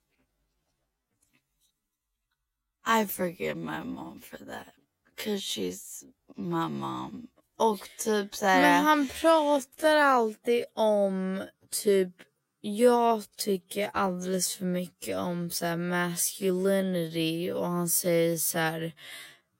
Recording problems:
wrong speed, natural pitch; too slow; 0.5 times normal speed

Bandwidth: 16 kHz